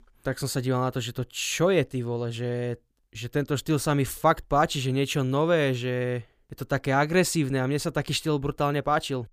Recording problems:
none

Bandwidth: 15 kHz